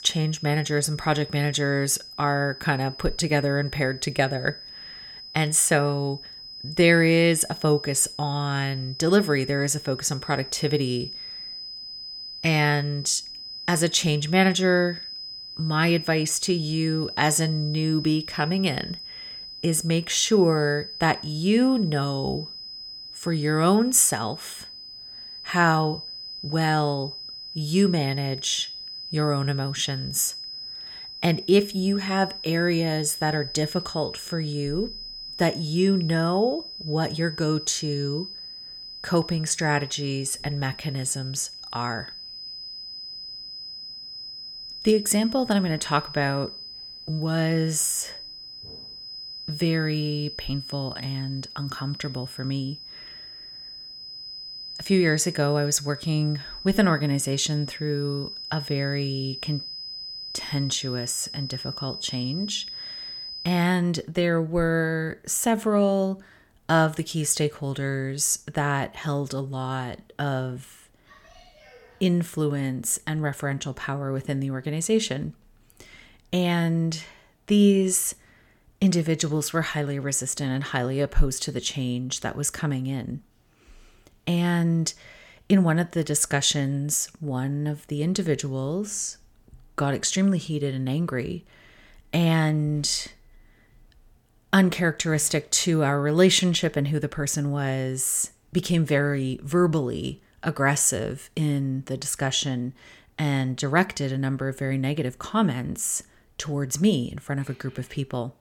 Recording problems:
high-pitched whine; noticeable; until 1:04; 5 kHz, 10 dB below the speech

